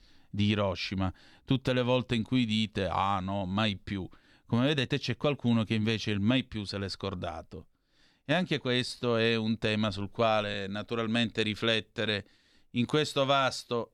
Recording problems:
uneven, jittery; slightly; from 2.5 to 13 s

